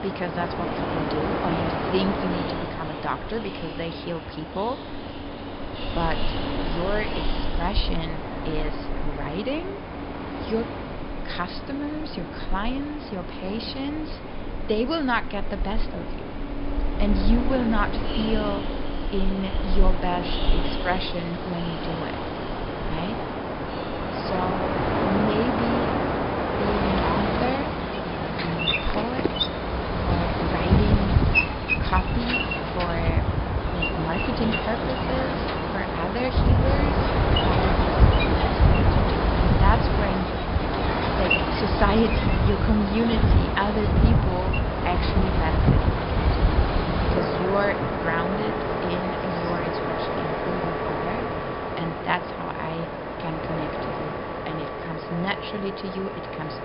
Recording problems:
high frequencies cut off; noticeable; nothing above 5.5 kHz
train or aircraft noise; very loud; throughout; 4 dB above the speech

